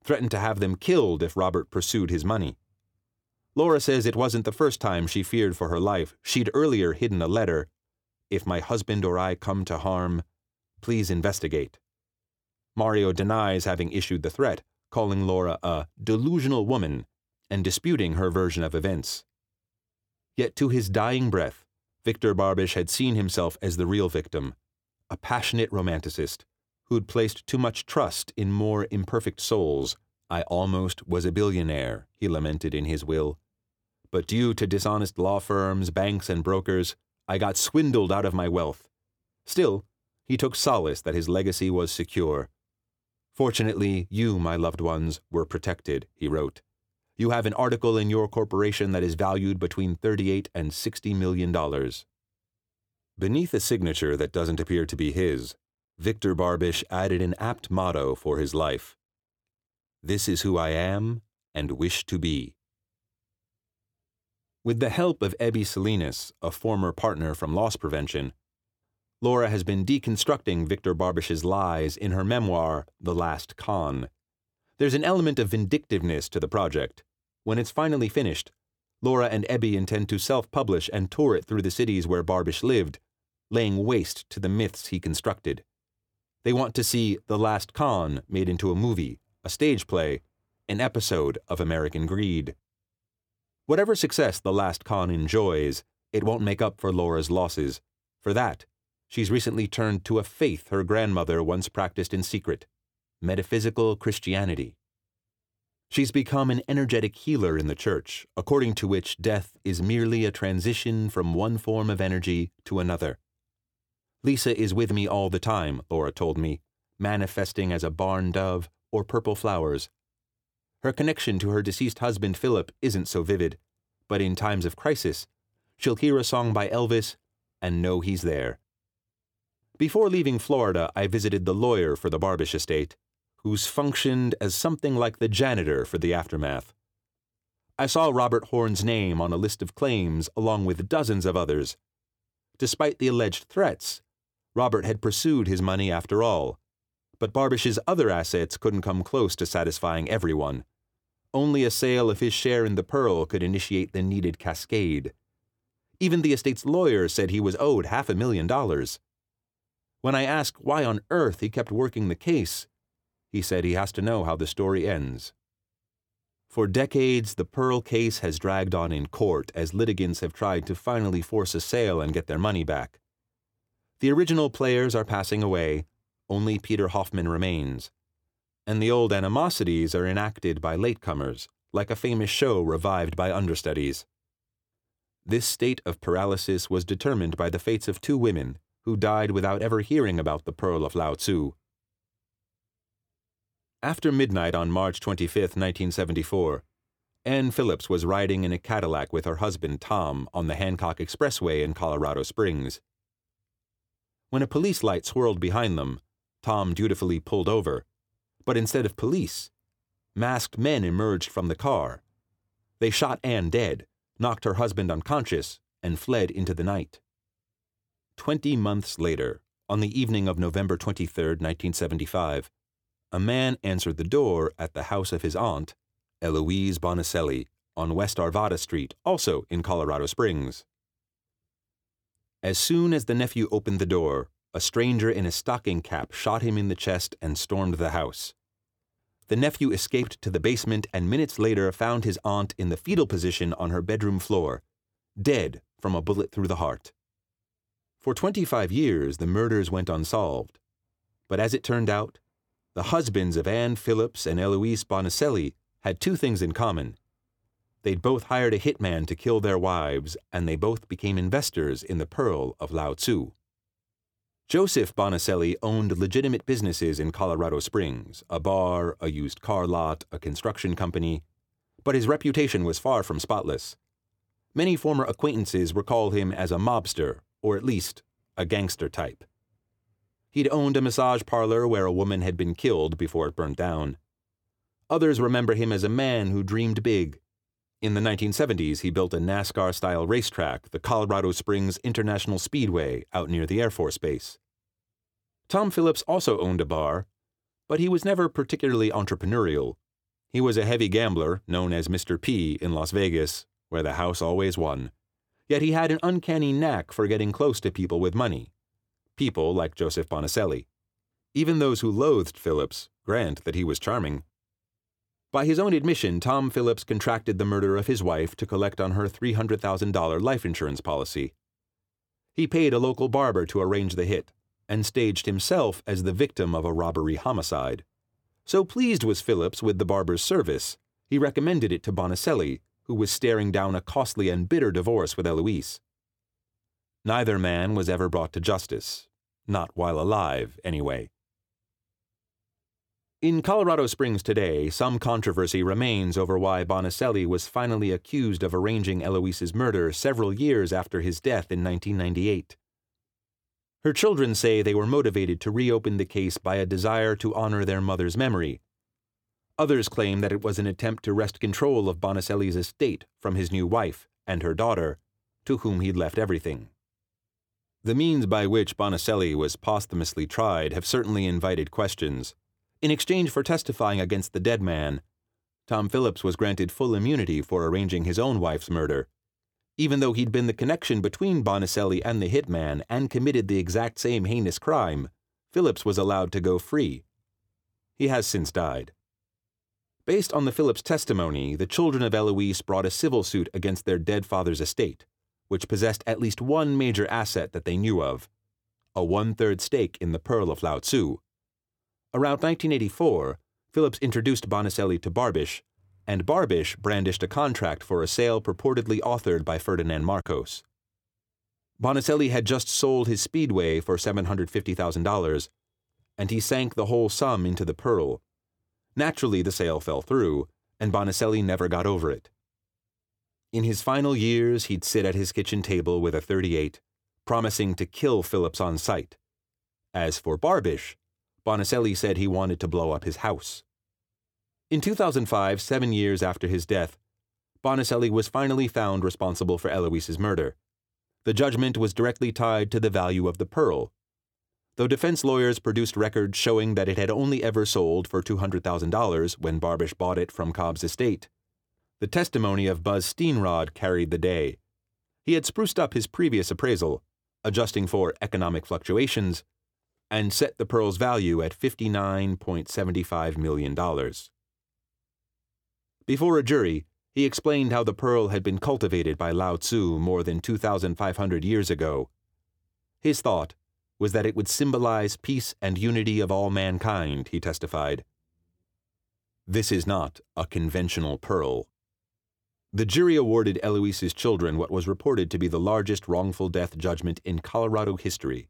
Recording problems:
none

